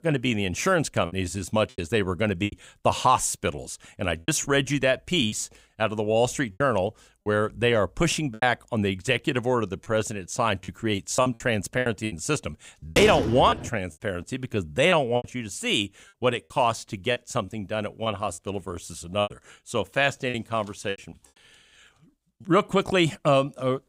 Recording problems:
choppy; very; 8% of the speech affected
door banging; noticeable; at 13 s; peak 2 dB below the speech

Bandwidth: 15.5 kHz